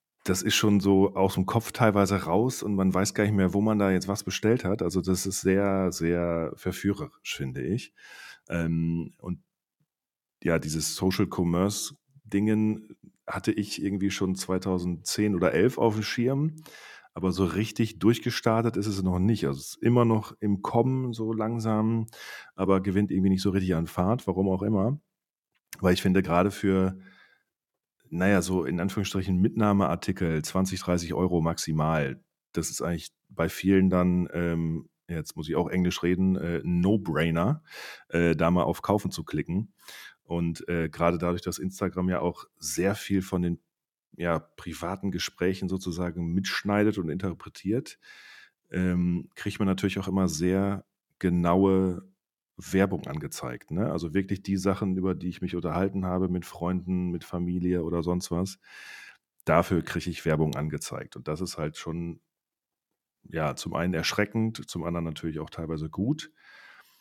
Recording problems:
none

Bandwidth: 17 kHz